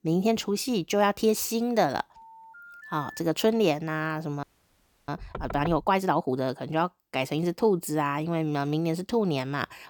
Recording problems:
phone ringing; faint; from 2 to 3 s; peak 15 dB below the speech
audio freezing; at 4.5 s for 0.5 s
door banging; faint; at 5 s; peak 10 dB below the speech

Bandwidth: 18.5 kHz